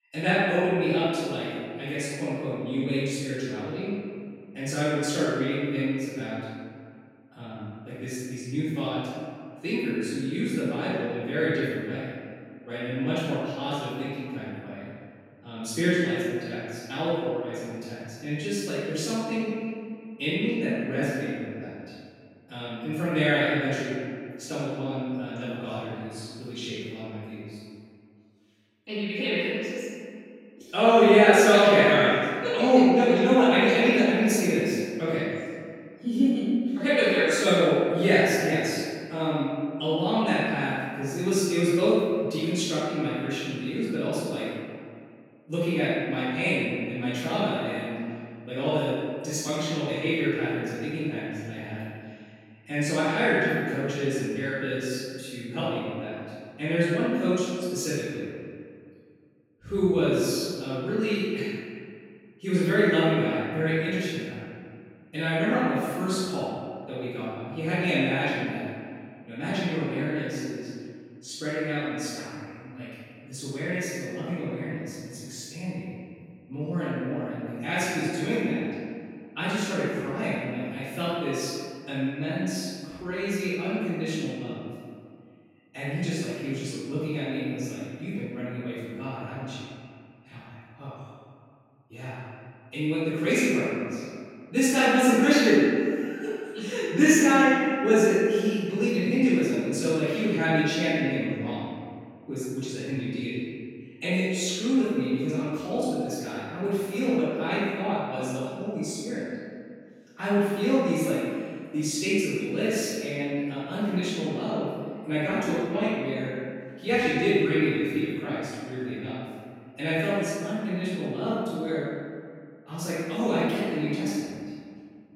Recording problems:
room echo; strong; dies away in 2 s
off-mic speech; far

